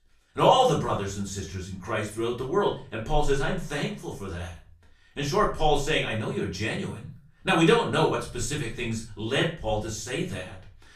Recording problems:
off-mic speech; far
room echo; slight; dies away in 0.3 s

